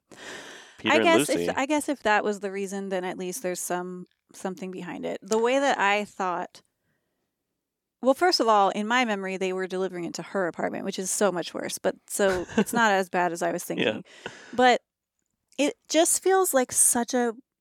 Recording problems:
none

